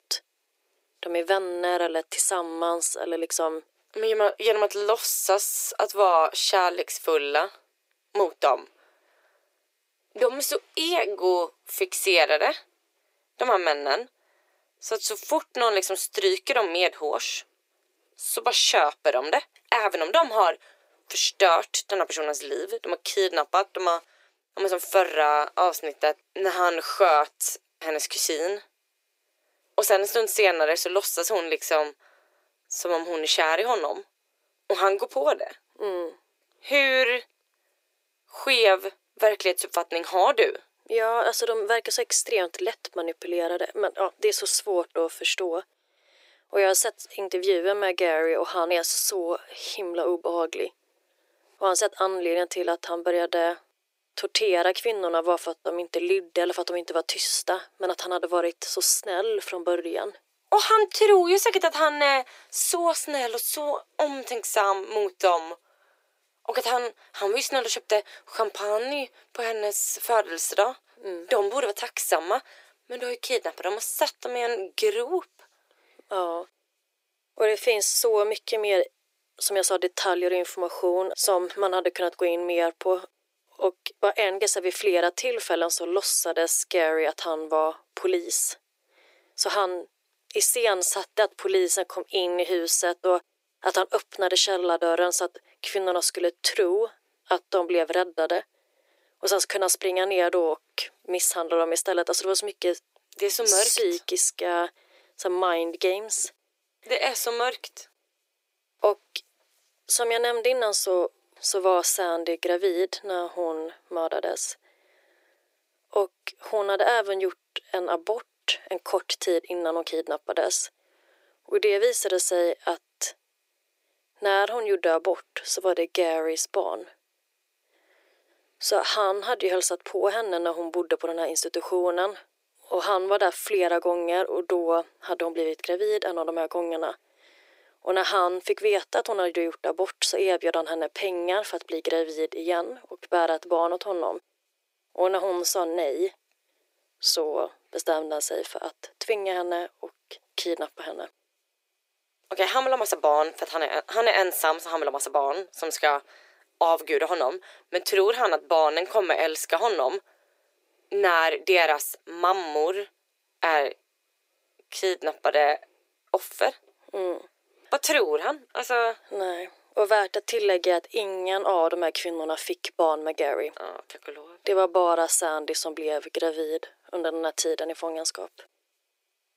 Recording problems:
thin; very; fading below 350 Hz

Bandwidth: 15.5 kHz